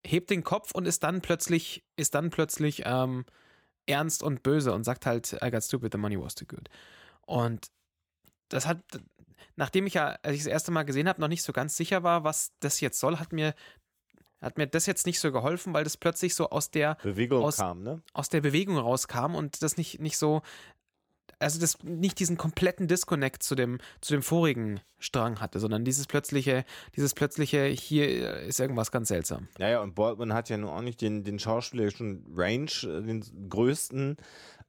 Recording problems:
none

